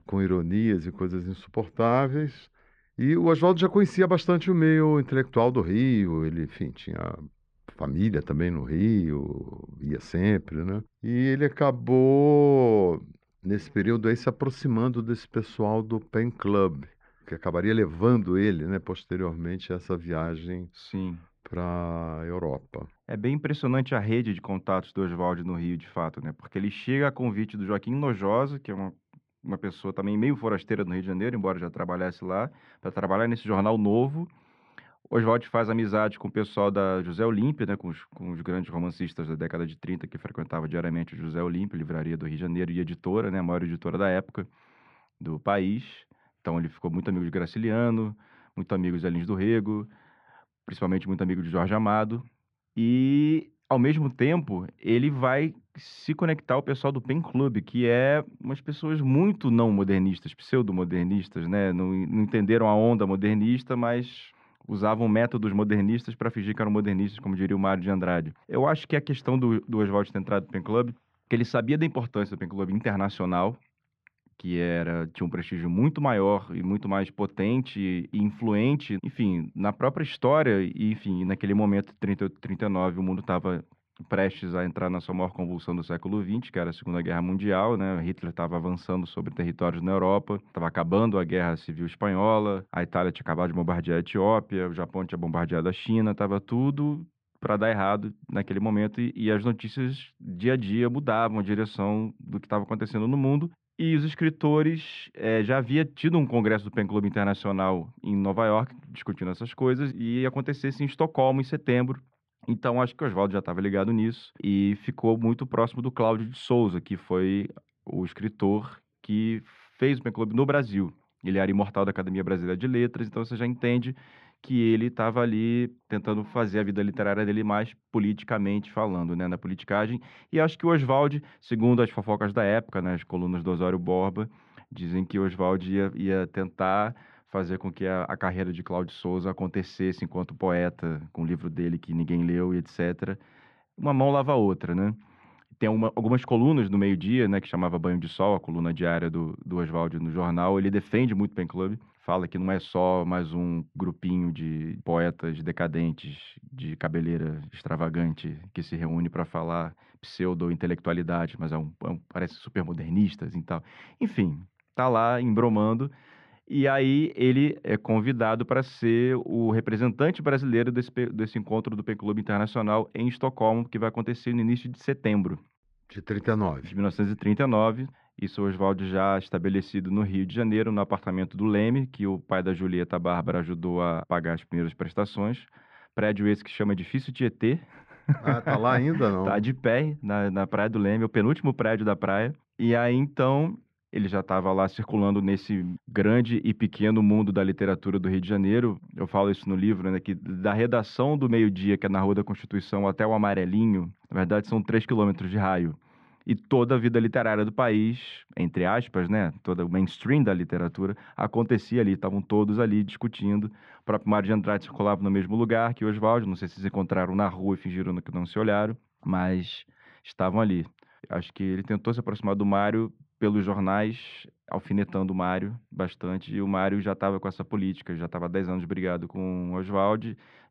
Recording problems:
muffled; very; fading above 2 kHz

